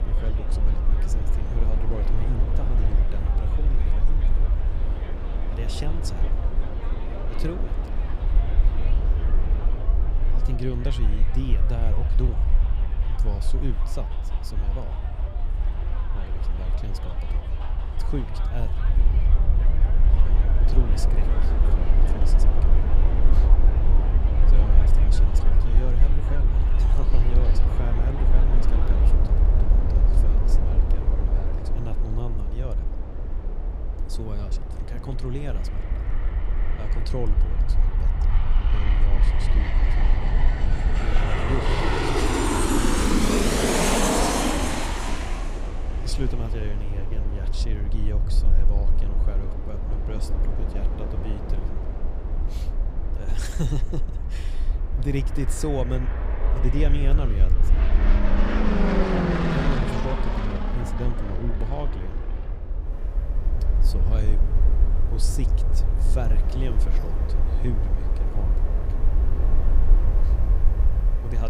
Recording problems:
train or aircraft noise; very loud; throughout; 3 dB above the speech
low rumble; loud; throughout; 8 dB below the speech
abrupt cut into speech; at the end

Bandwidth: 15.5 kHz